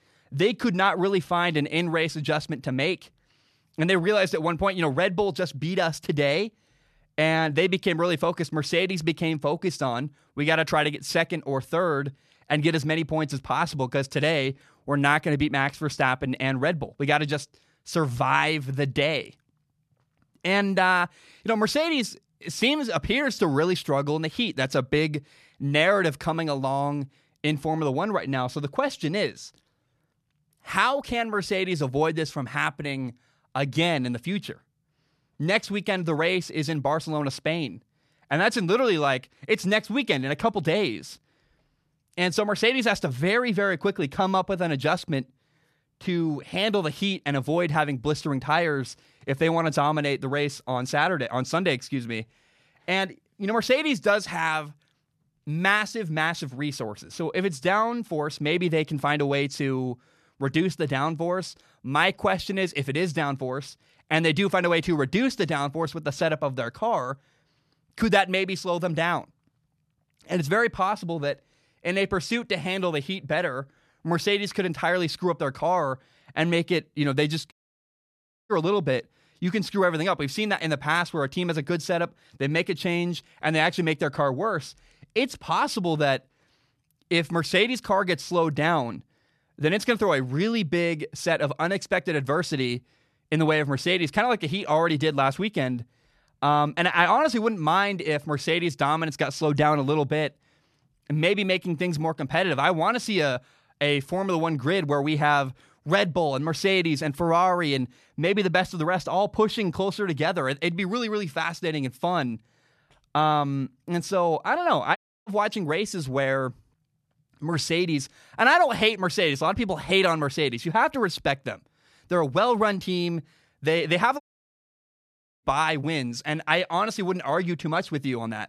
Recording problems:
audio cutting out; at 1:18 for 1 s, at 1:55 and at 2:04 for 1 s

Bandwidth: 13.5 kHz